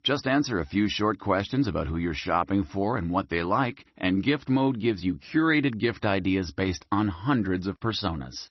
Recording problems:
garbled, watery; slightly; nothing above 6 kHz

